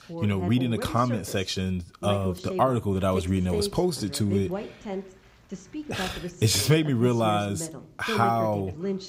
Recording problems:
voice in the background; loud; throughout; 9 dB below the speech

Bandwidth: 15.5 kHz